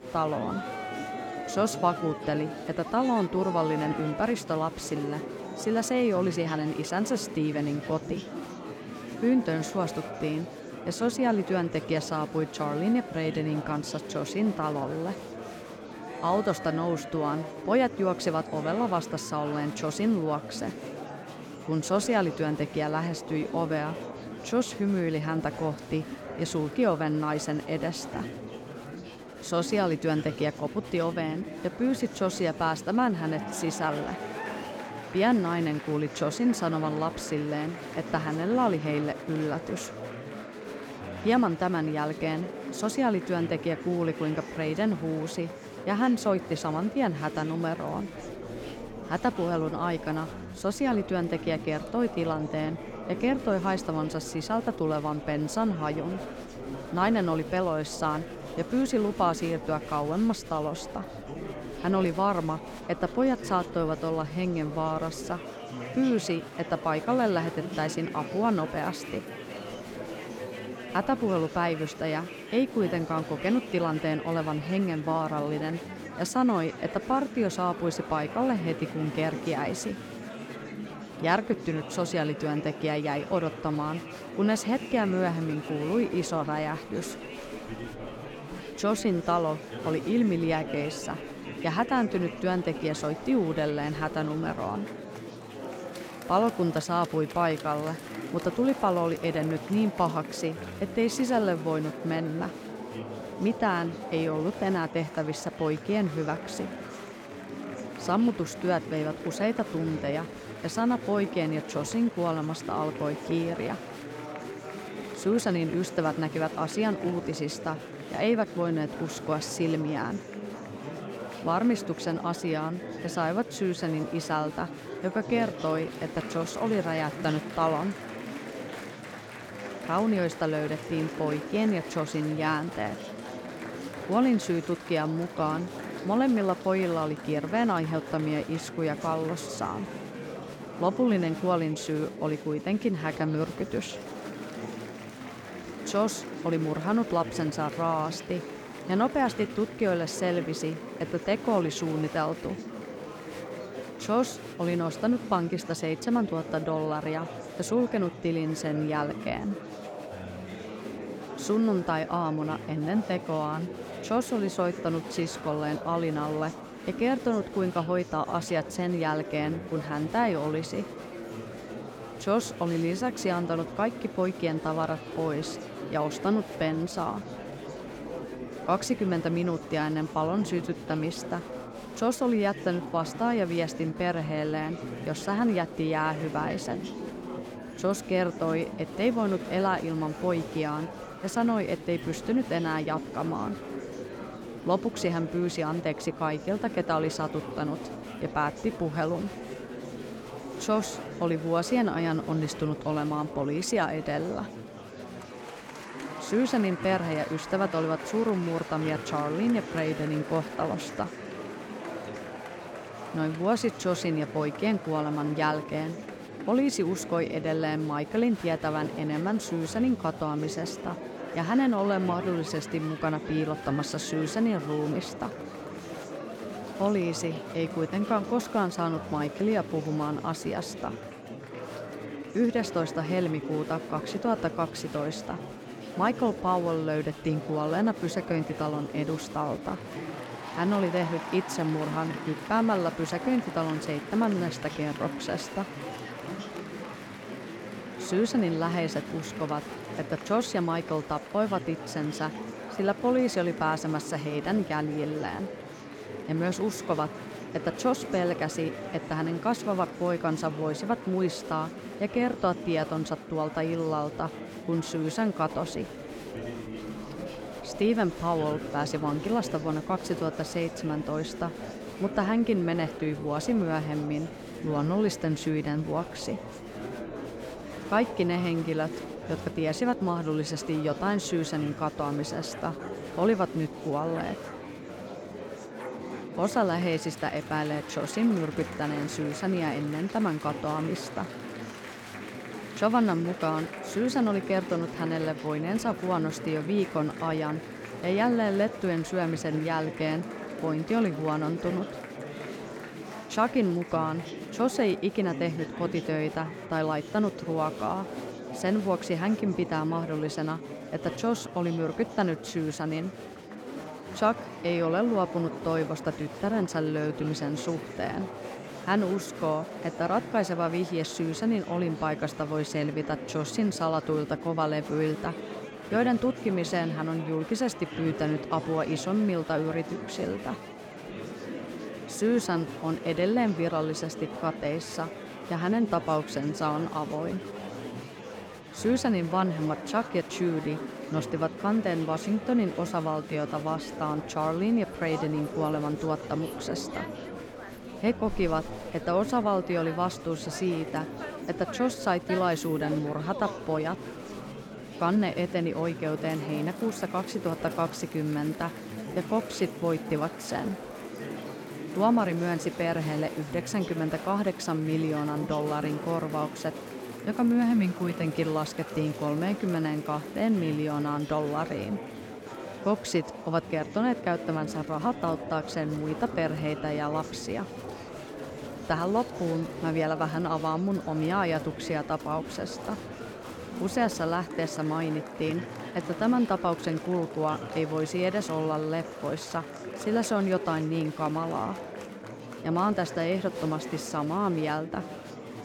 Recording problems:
murmuring crowd; loud; throughout; 10 dB below the speech
dog barking; faint; from 4:43 to 4:46; peak 15 dB below the speech

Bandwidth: 17.5 kHz